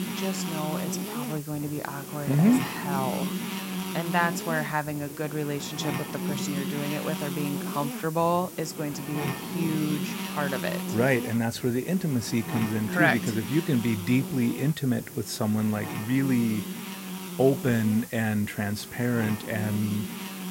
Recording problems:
electrical hum; loud; throughout; 60 Hz, 7 dB below the speech
hiss; noticeable; throughout; 15 dB below the speech

